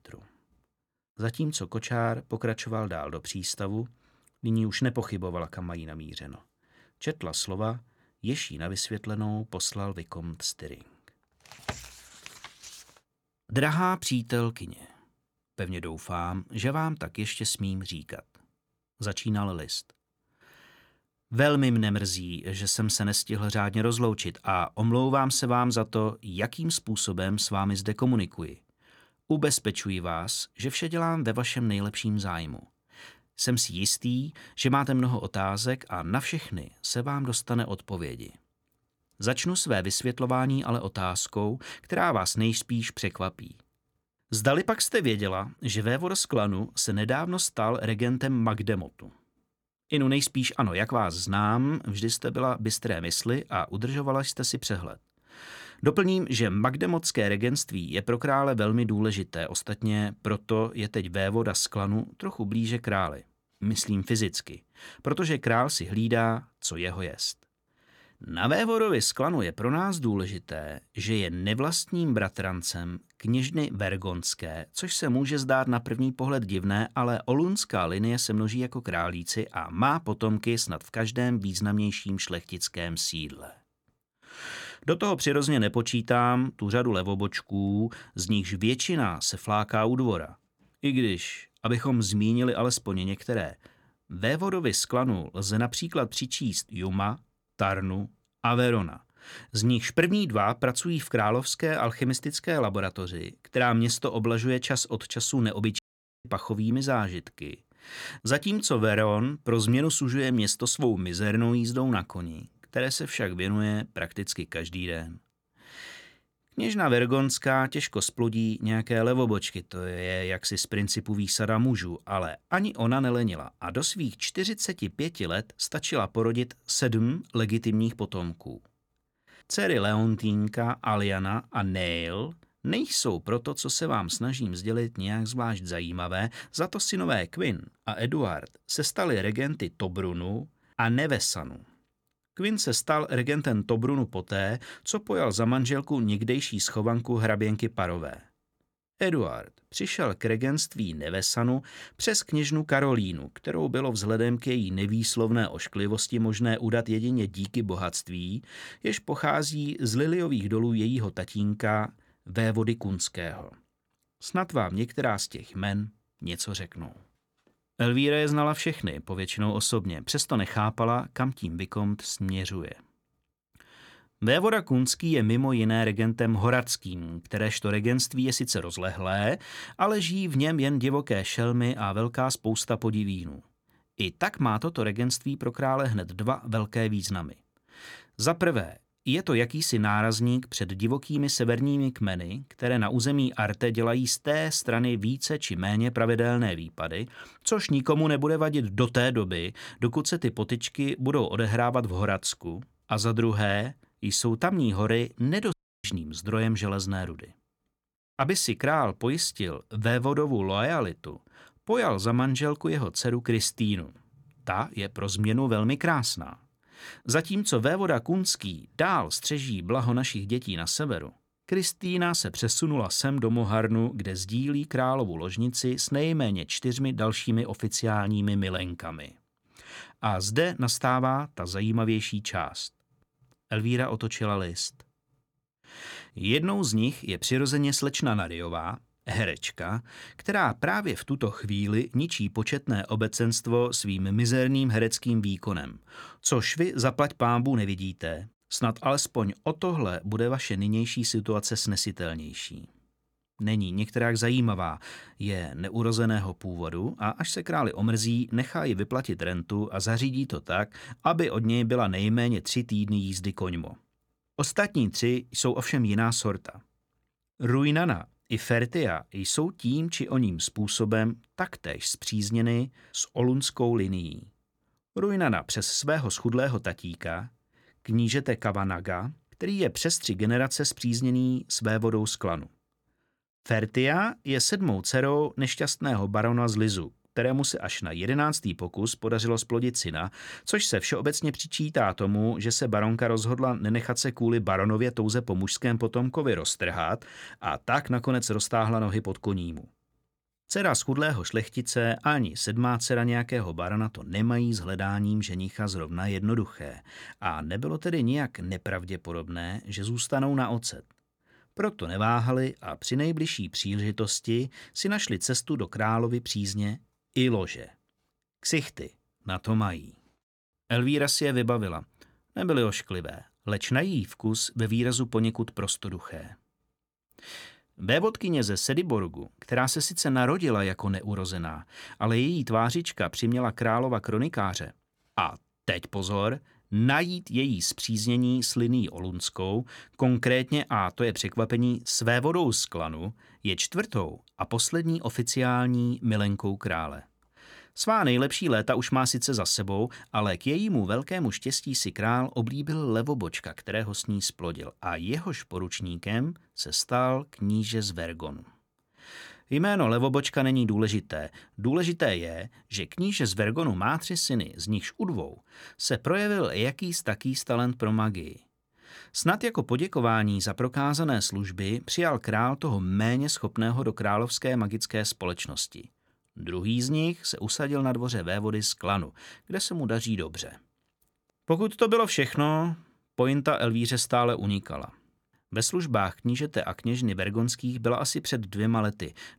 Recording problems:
audio cutting out; at 1:46 and at 3:26

